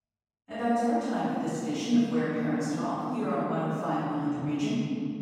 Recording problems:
room echo; strong; dies away in 3 s
off-mic speech; far

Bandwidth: 16 kHz